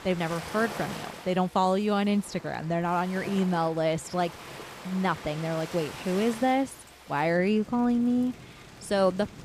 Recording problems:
rain or running water; noticeable; throughout; 15 dB below the speech

